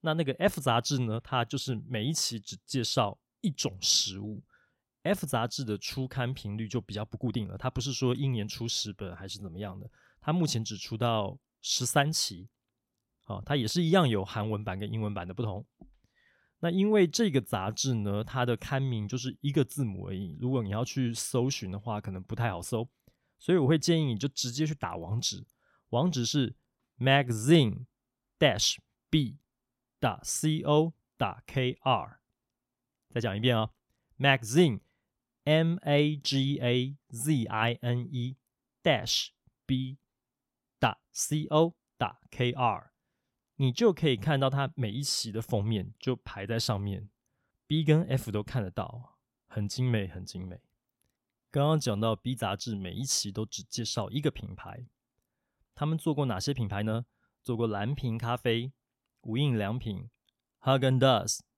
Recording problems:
uneven, jittery; strongly; from 7 to 58 s

